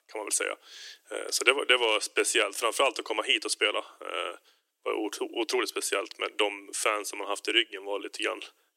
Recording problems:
thin; very; fading below 300 Hz

